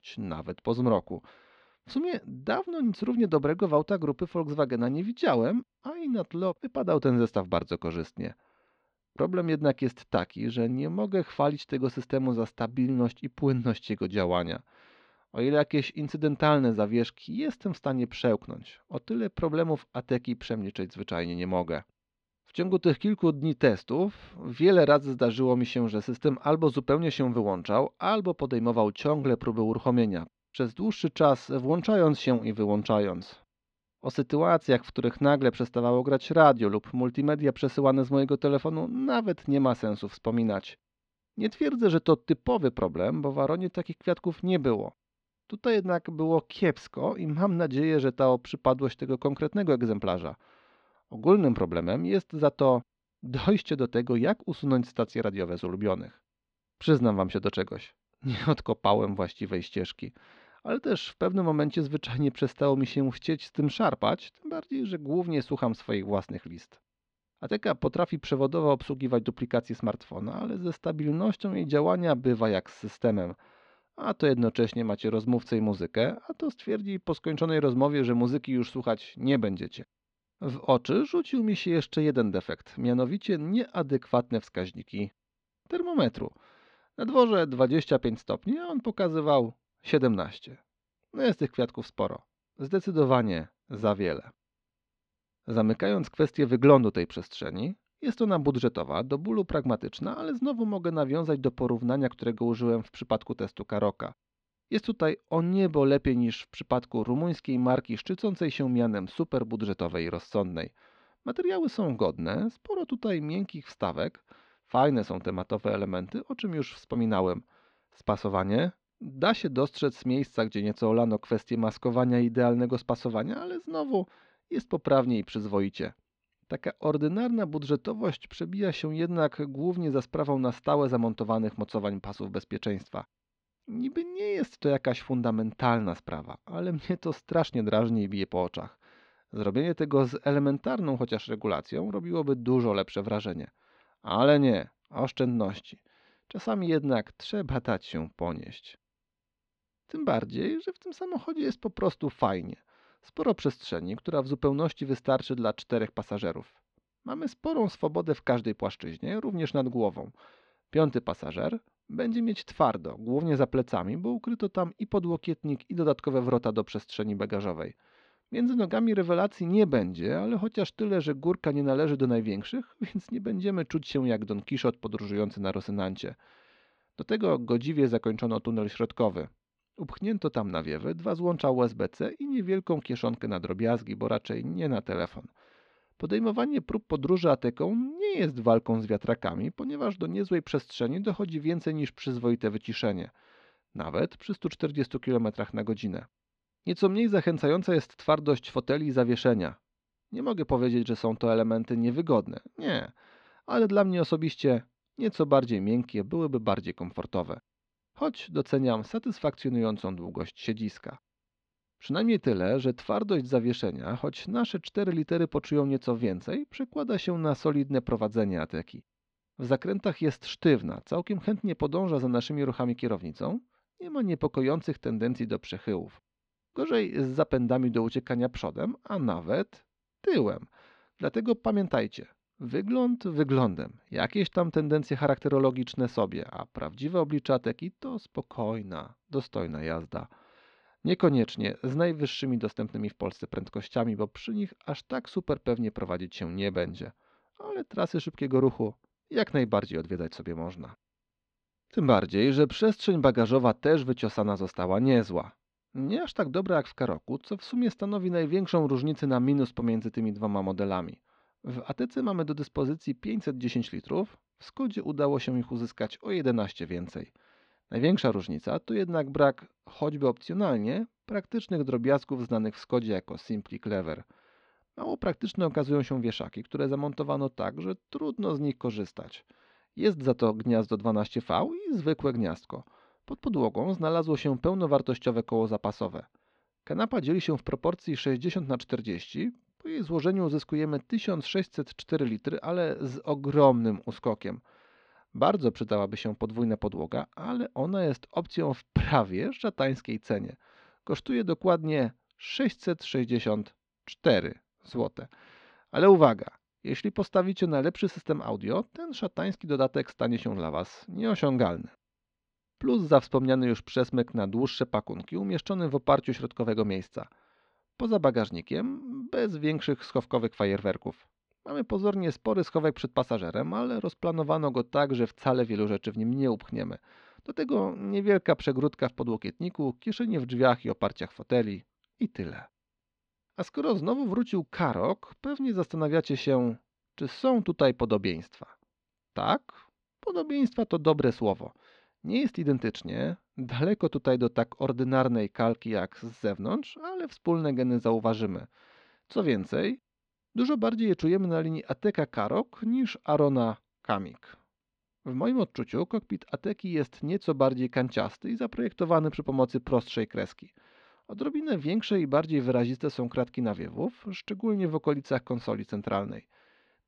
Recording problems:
muffled; slightly; fading above 3.5 kHz

